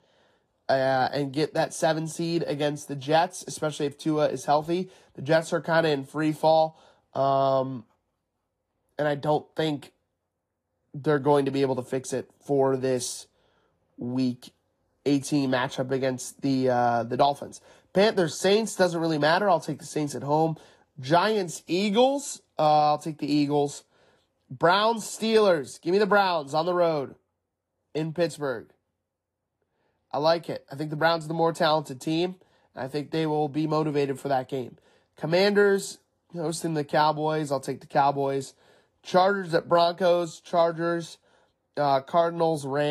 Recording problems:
garbled, watery; slightly
abrupt cut into speech; at the end

